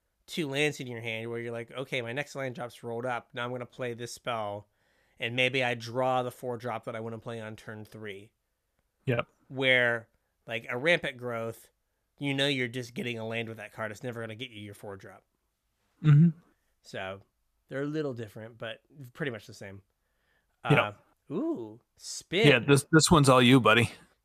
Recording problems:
none

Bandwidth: 14.5 kHz